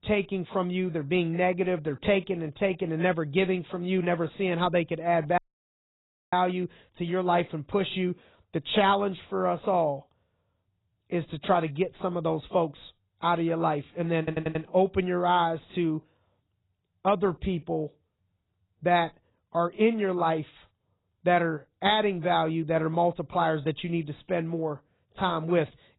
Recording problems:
garbled, watery; badly; nothing above 4 kHz
audio cutting out; at 5.5 s for 1 s
audio stuttering; at 14 s

